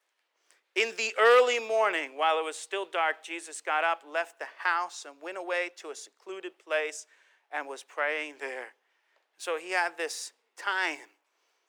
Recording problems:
thin; very; fading below 400 Hz

